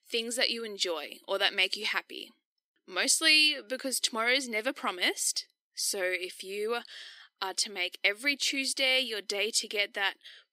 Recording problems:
thin; very slightly; fading below 300 Hz

